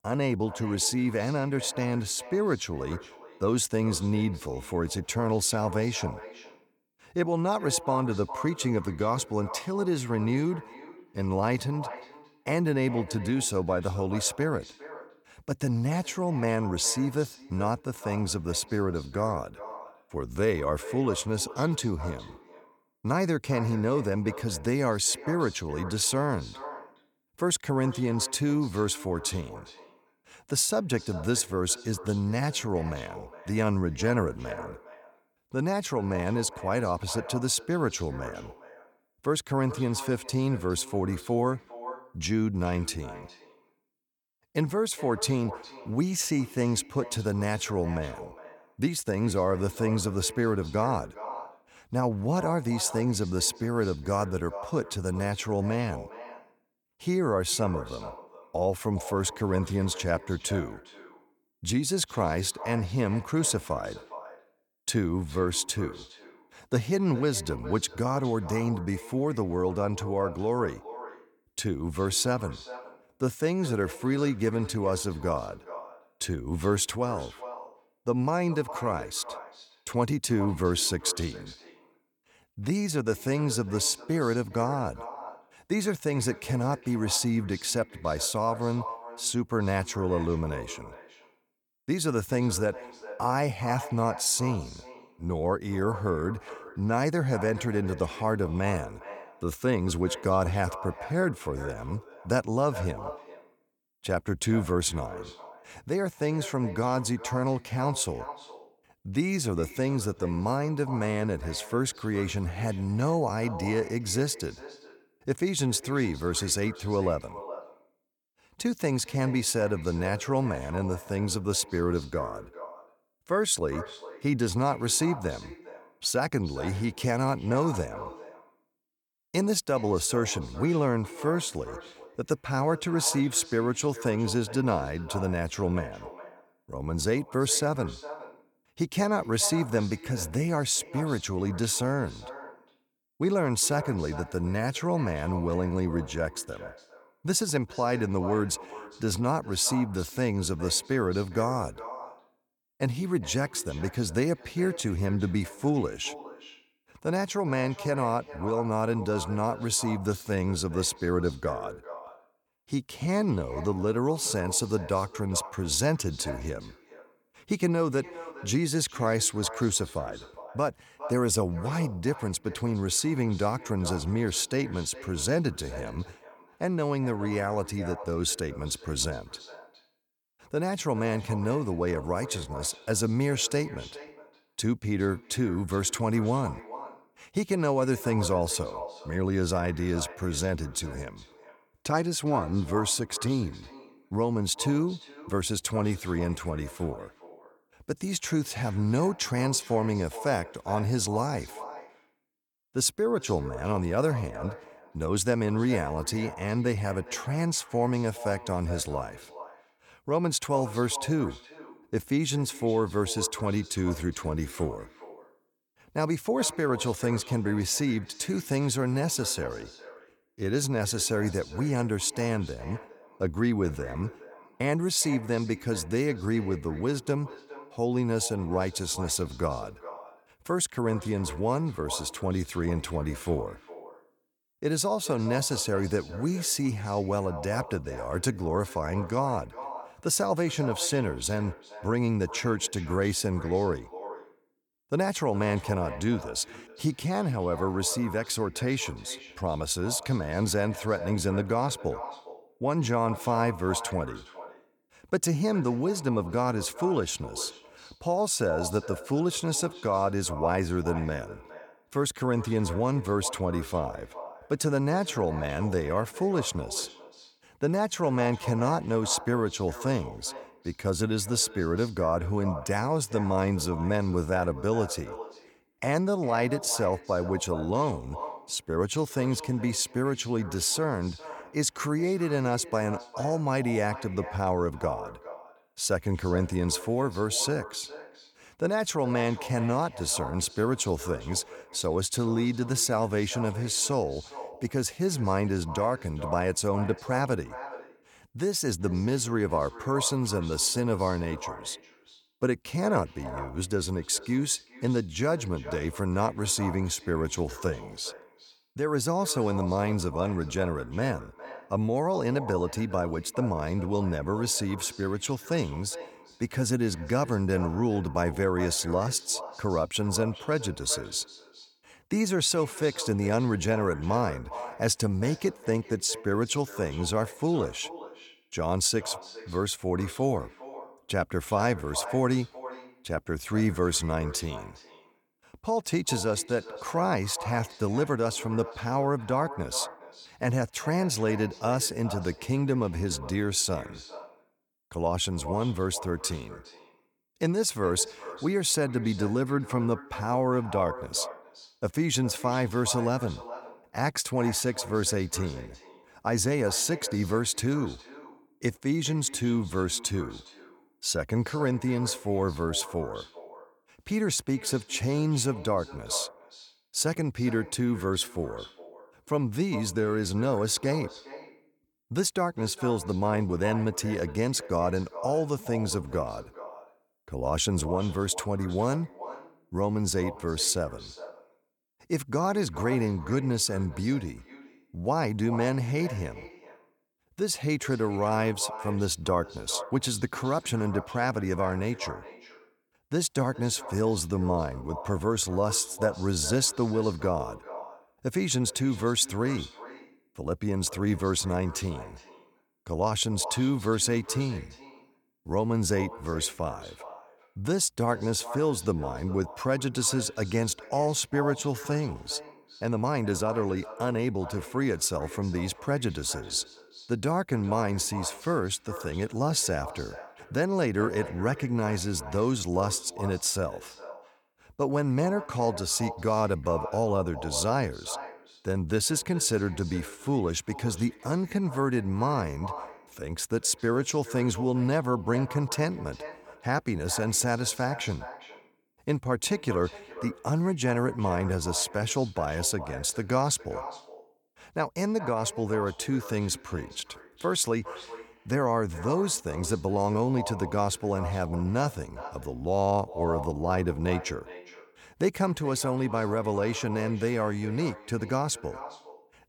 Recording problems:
echo of what is said; noticeable; throughout; 410 ms later, 15 dB below the speech

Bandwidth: 18.5 kHz